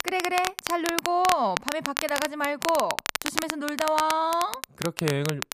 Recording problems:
crackle, like an old record; loud; 4 dB below the speech

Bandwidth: 14.5 kHz